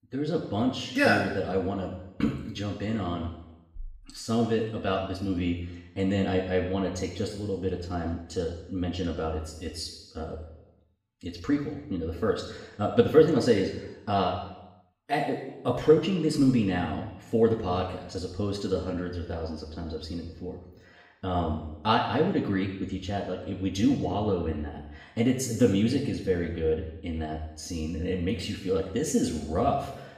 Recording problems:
off-mic speech; far
room echo; noticeable; dies away in 0.9 s

